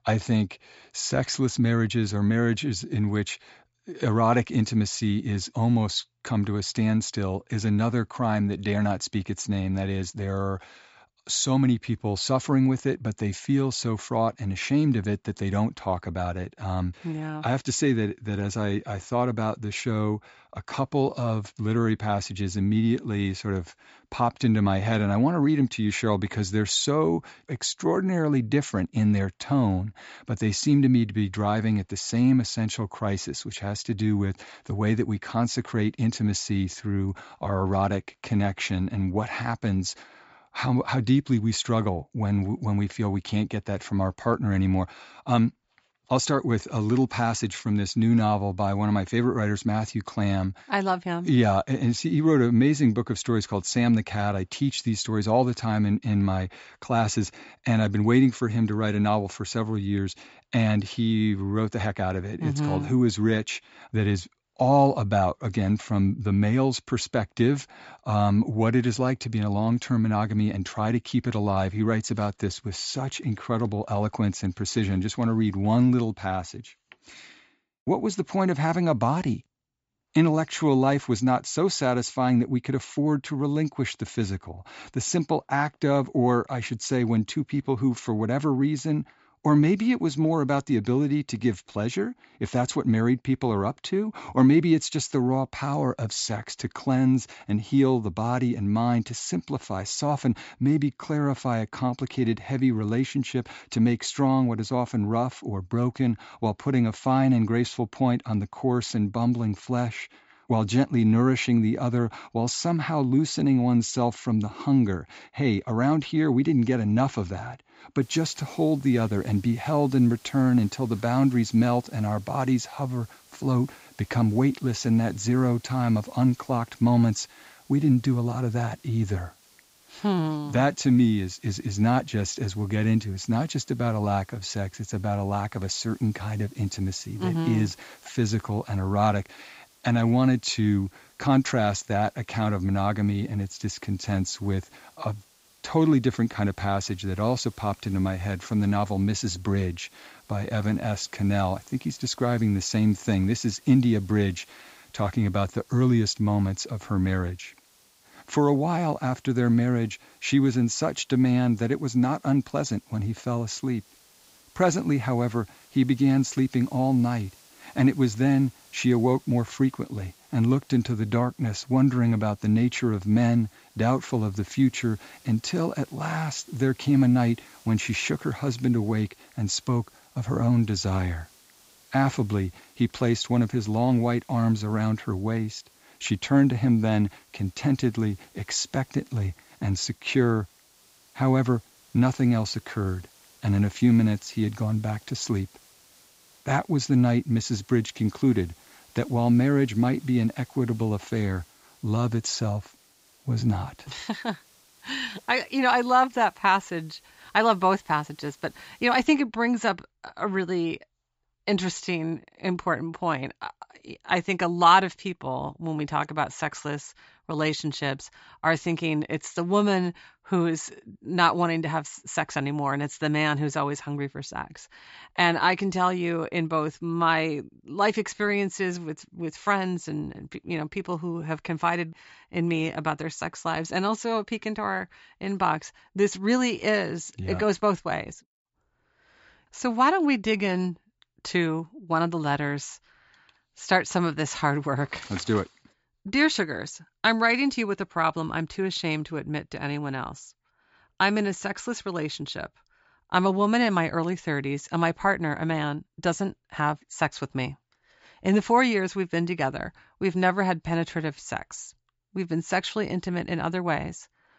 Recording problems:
high frequencies cut off; noticeable; nothing above 8 kHz
hiss; faint; from 1:58 to 3:29; 30 dB below the speech

